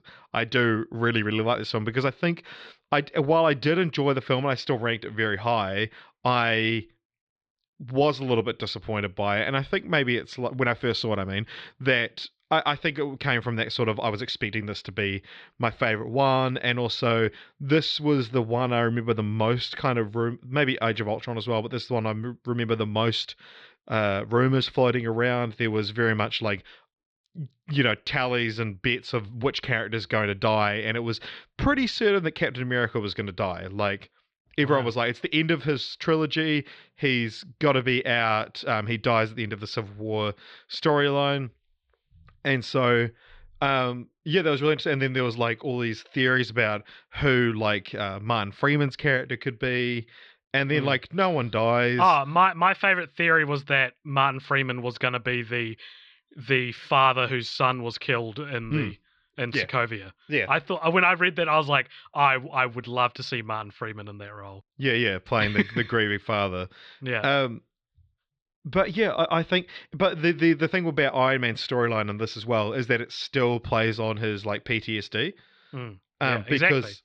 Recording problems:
muffled; slightly; fading above 4 kHz

